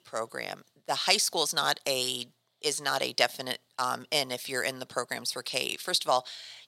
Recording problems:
thin; somewhat; fading below 400 Hz

